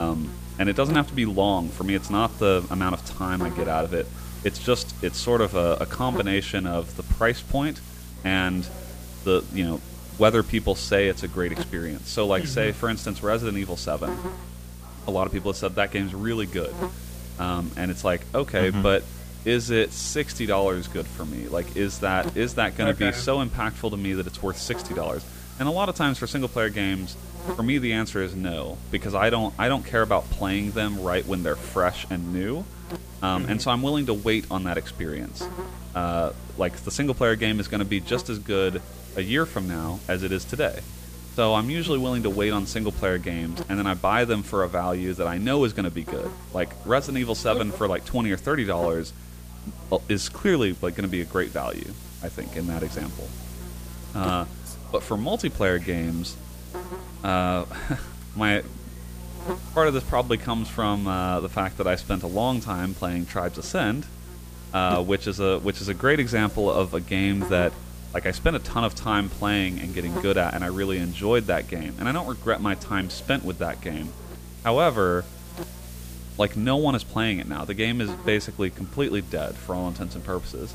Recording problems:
electrical hum; noticeable; throughout; 60 Hz, 20 dB below the speech
background chatter; faint; throughout; 3 voices, 25 dB below the speech
hiss; faint; throughout; 20 dB below the speech
abrupt cut into speech; at the start

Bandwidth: 15 kHz